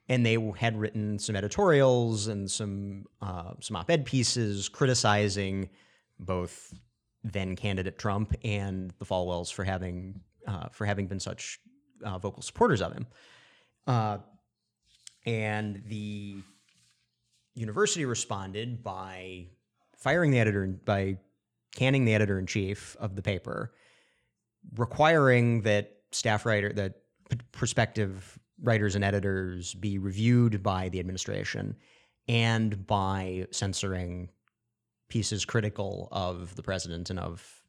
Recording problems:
none

